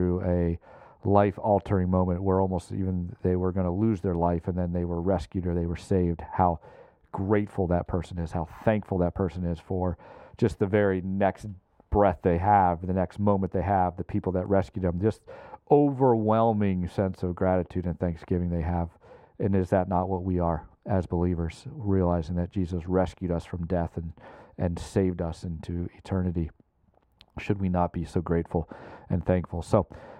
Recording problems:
muffled; very; fading above 2.5 kHz
abrupt cut into speech; at the start

